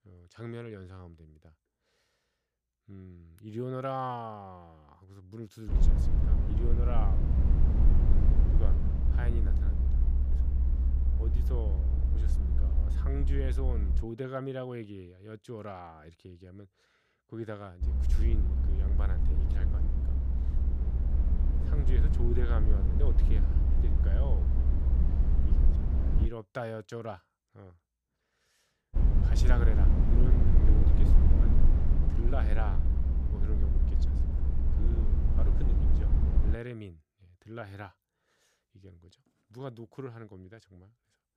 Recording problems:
low rumble; loud; from 5.5 to 14 s, from 18 to 26 s and from 29 to 37 s; 2 dB below the speech

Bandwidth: 15 kHz